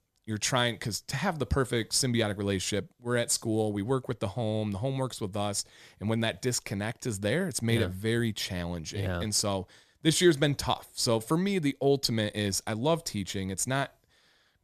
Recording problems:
none

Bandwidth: 14 kHz